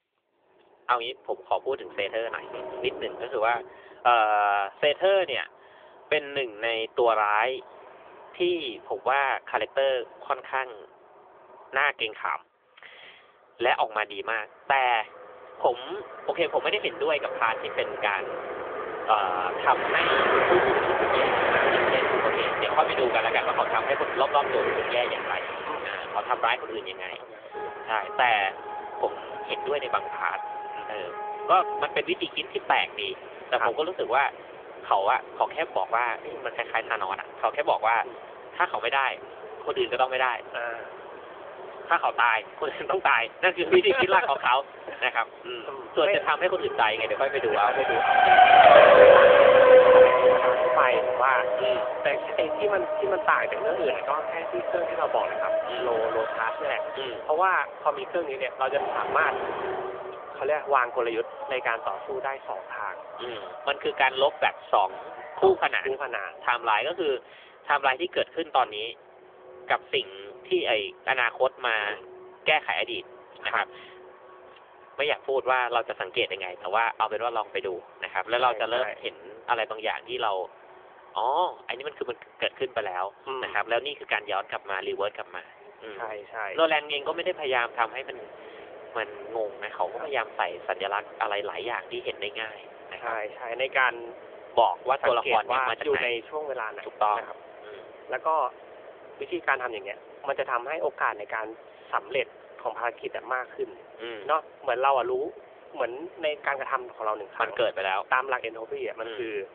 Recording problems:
phone-call audio; nothing above 3.5 kHz
traffic noise; very loud; throughout; 3 dB above the speech

